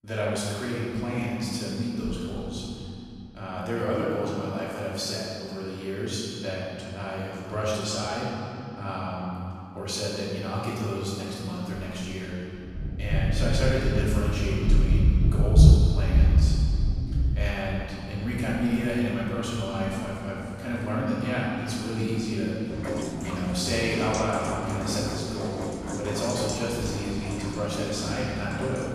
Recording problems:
room echo; strong; dies away in 2.6 s
off-mic speech; far
rain or running water; very loud; from 13 s on; 3 dB above the speech

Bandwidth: 14.5 kHz